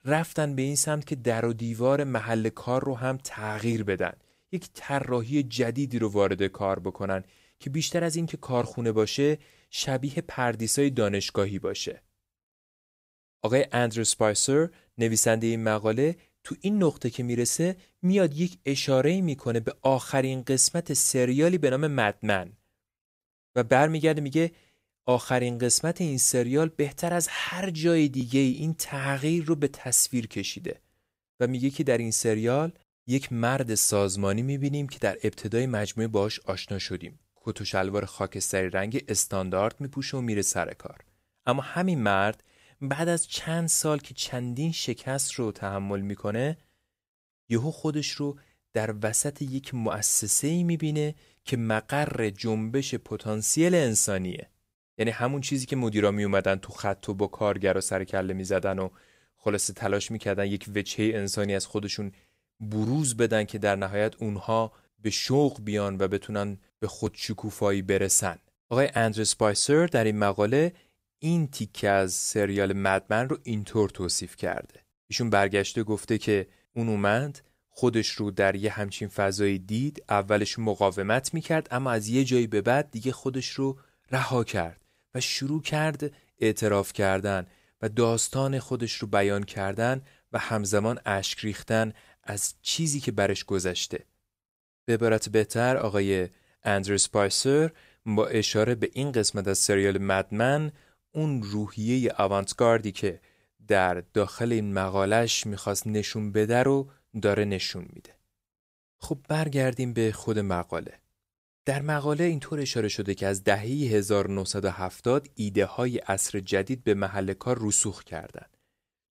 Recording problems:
none

